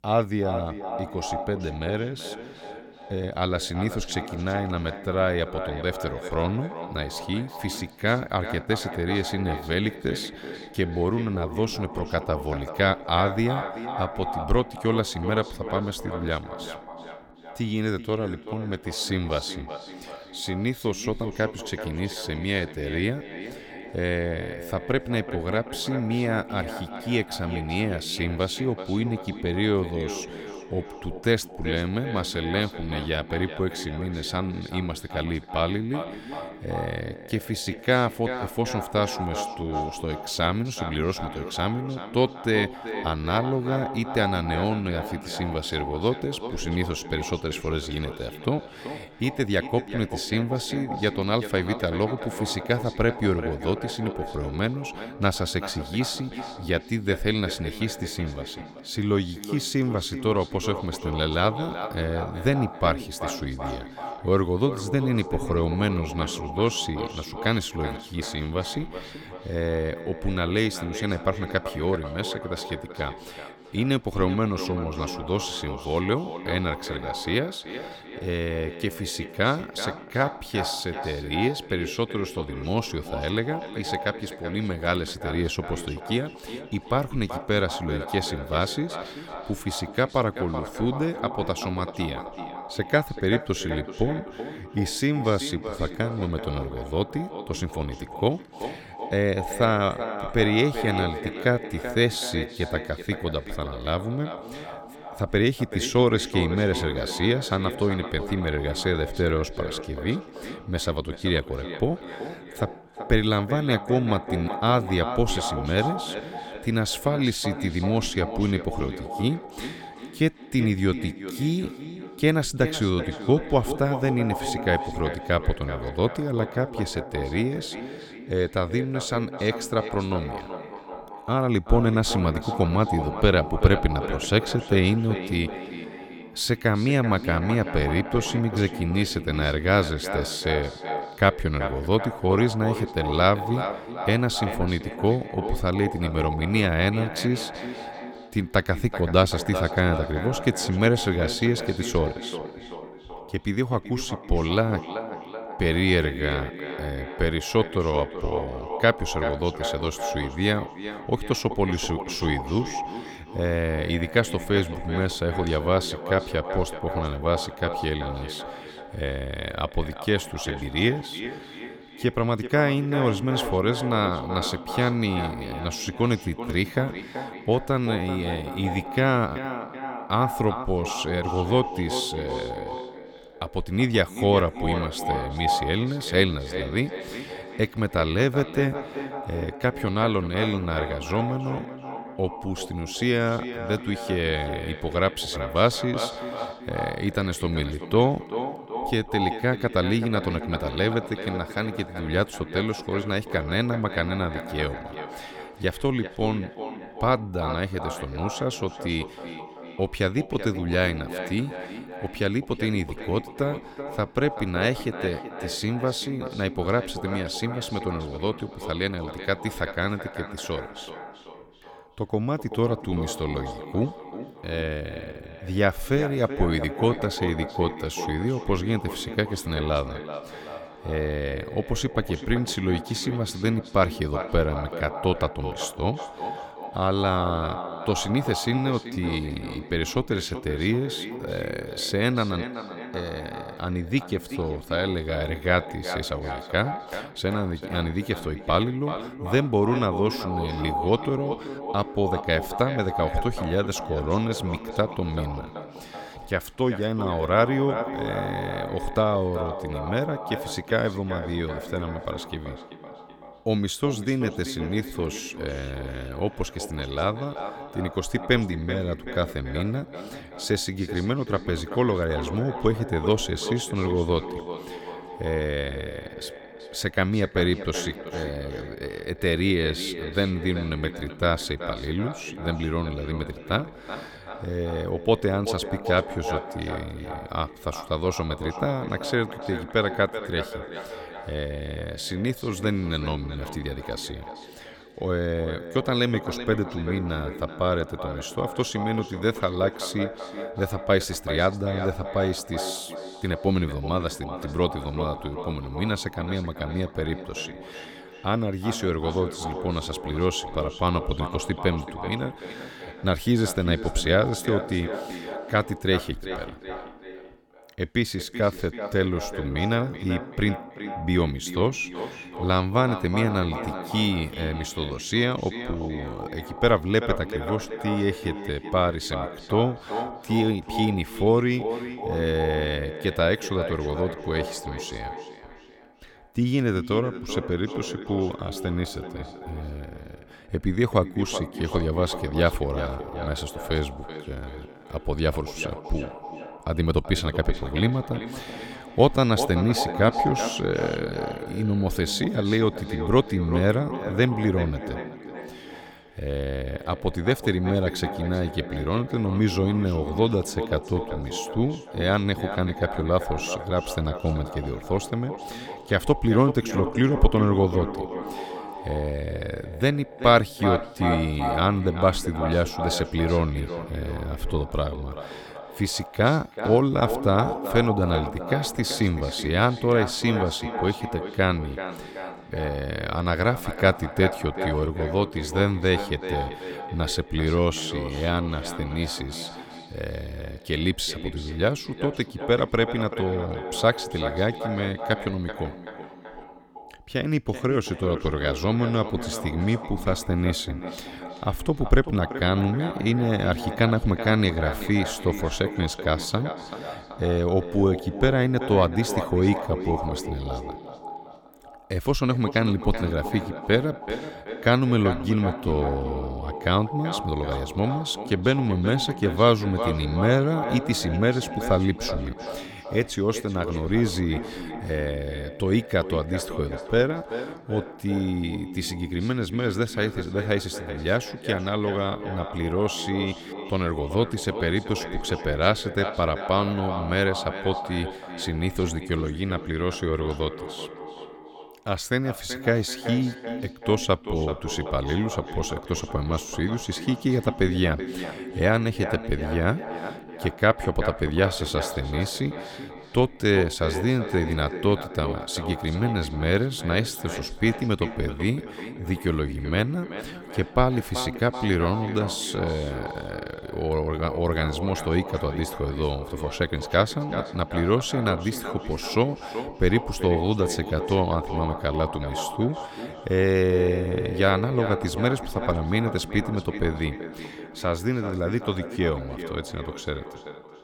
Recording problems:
echo of what is said; strong; throughout; 380 ms later, 9 dB below the speech

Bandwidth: 17.5 kHz